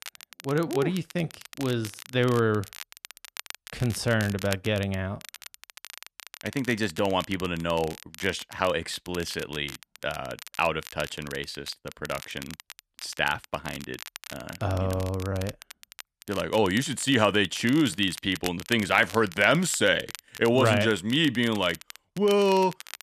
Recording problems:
crackle, like an old record; noticeable; 15 dB below the speech

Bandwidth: 14 kHz